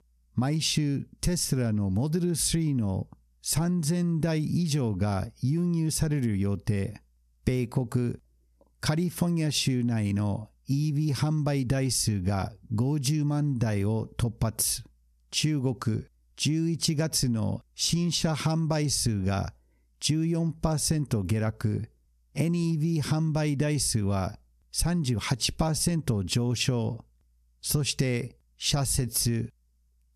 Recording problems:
squashed, flat; somewhat

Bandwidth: 13.5 kHz